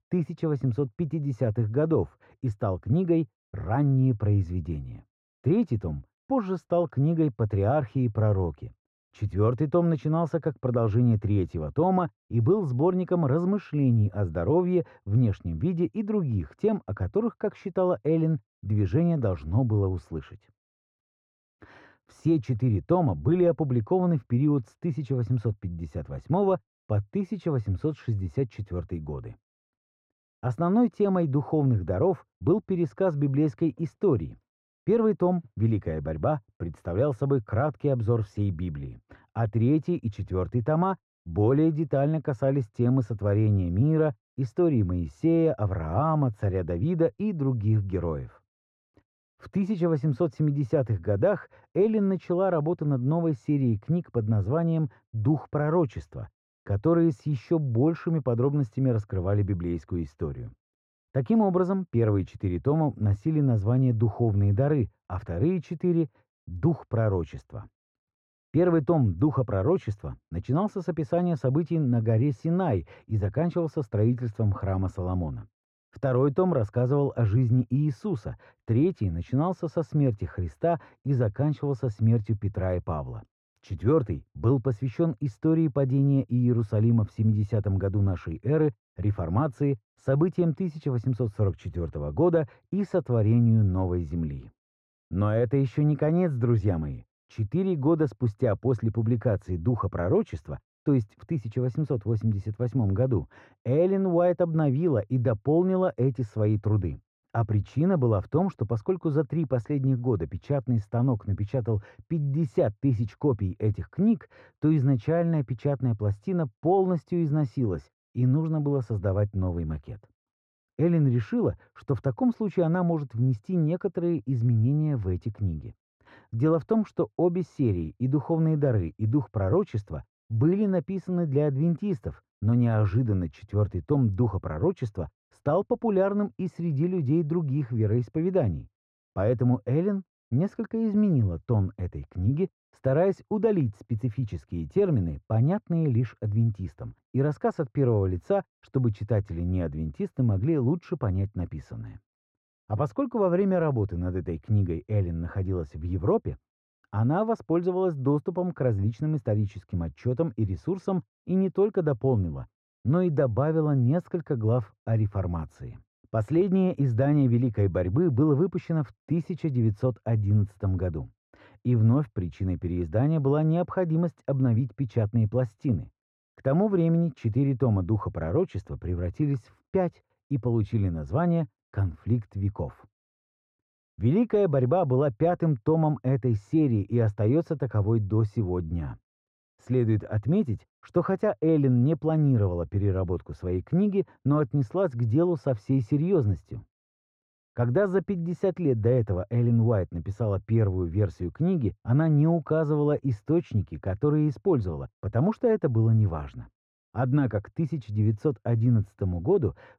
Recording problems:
muffled; very; fading above 1 kHz

